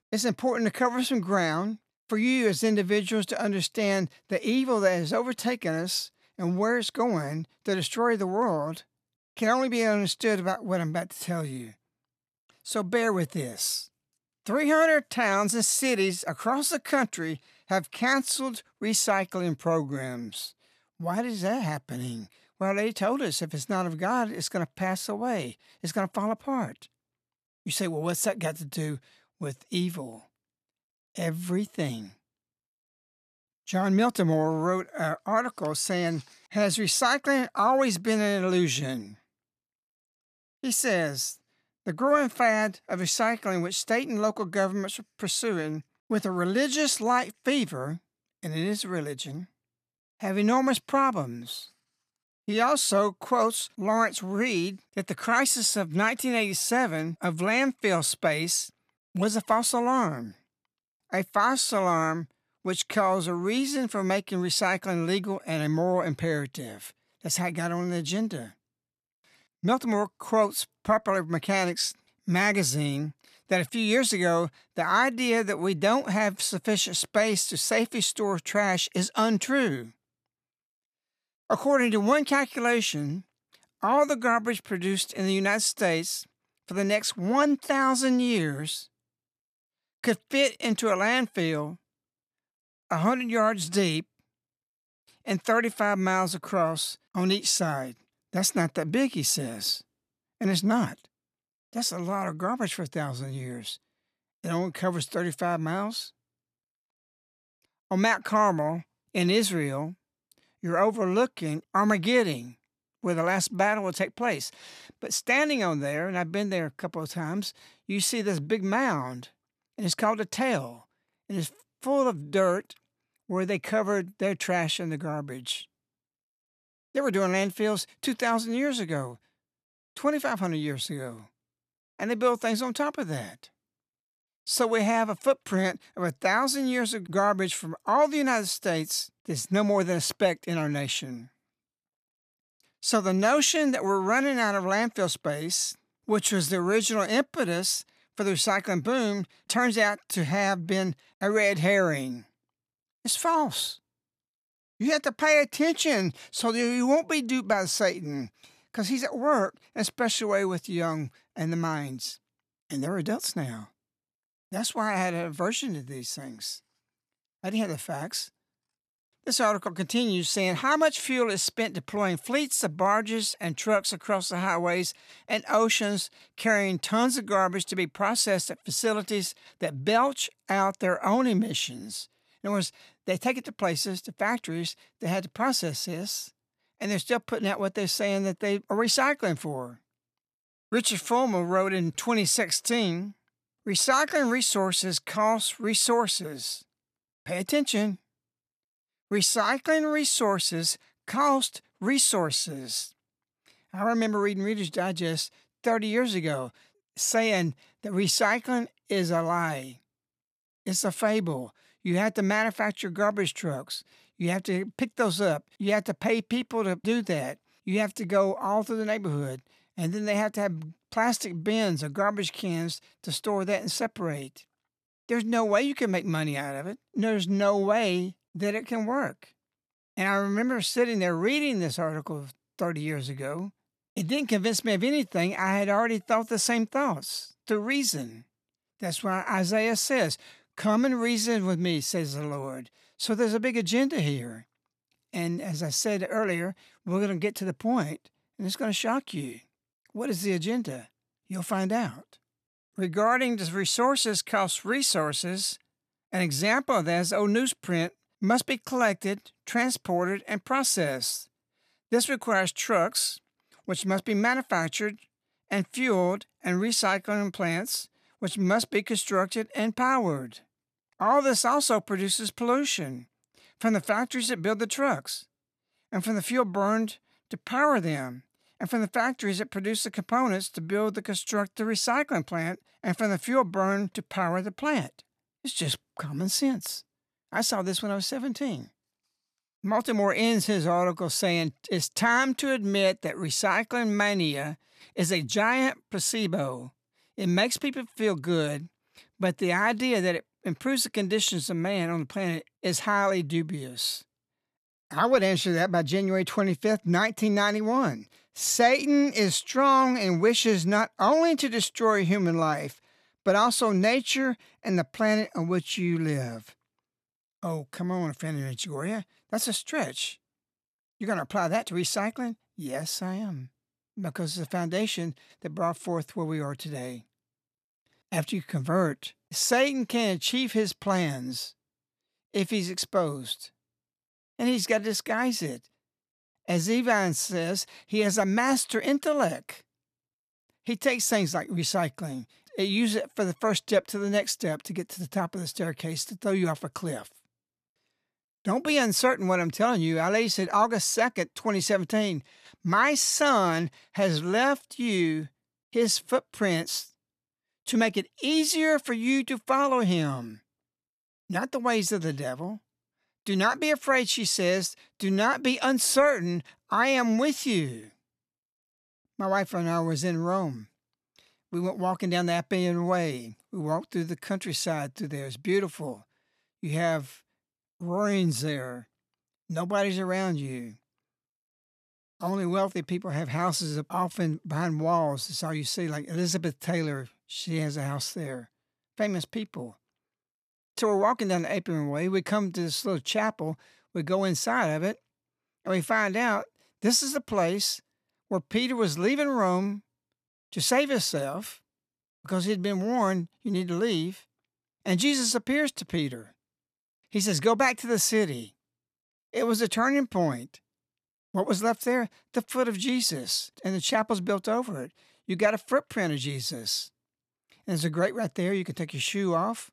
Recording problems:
none

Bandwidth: 14.5 kHz